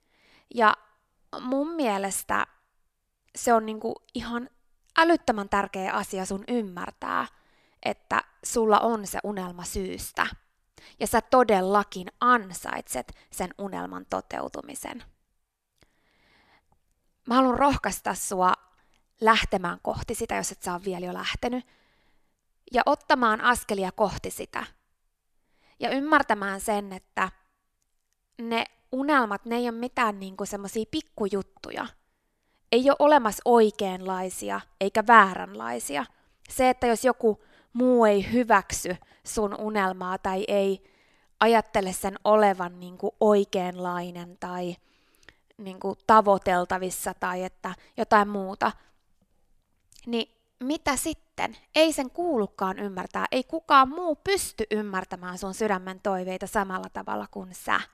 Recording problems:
none

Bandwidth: 14 kHz